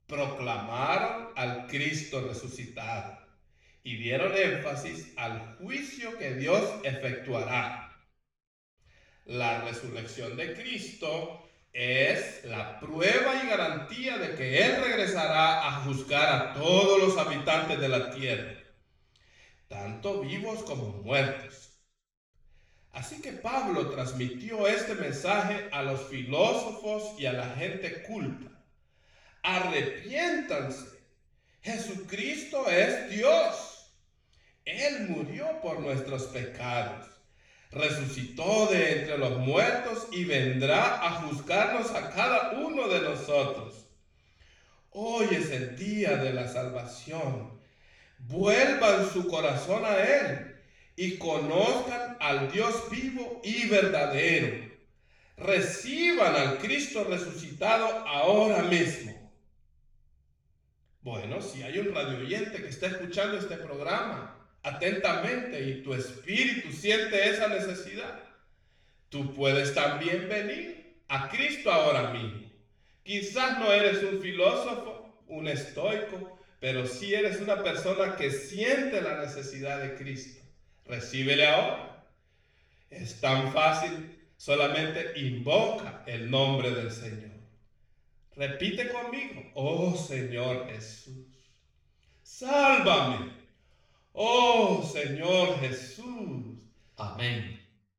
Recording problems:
off-mic speech; far
room echo; noticeable; dies away in 0.7 s

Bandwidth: 18.5 kHz